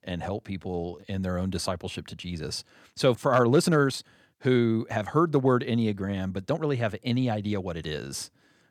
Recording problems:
uneven, jittery; strongly; from 0.5 to 8 s

